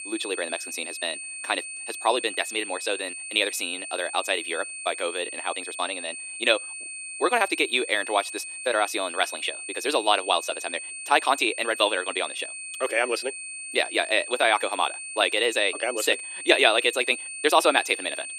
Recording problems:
thin; very; fading below 300 Hz
wrong speed, natural pitch; too fast; 1.5 times normal speed
high-pitched whine; loud; throughout; 2.5 kHz, 9 dB below the speech

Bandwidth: 15.5 kHz